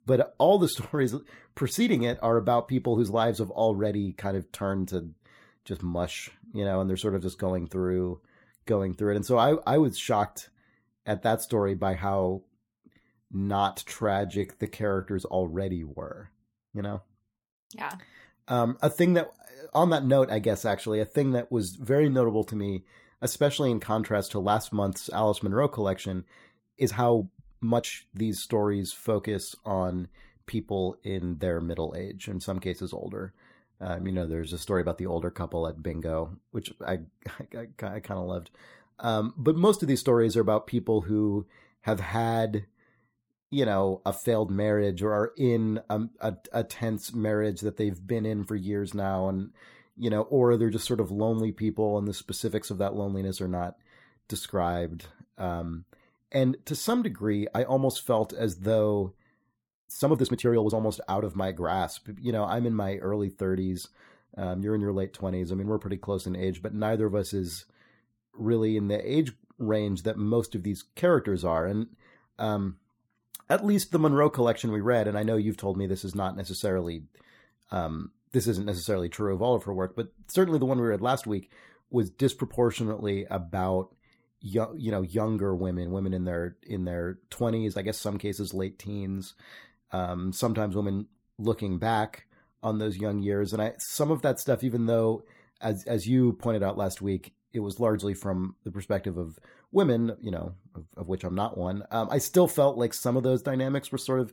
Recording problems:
uneven, jittery; strongly; from 14 s to 1:01

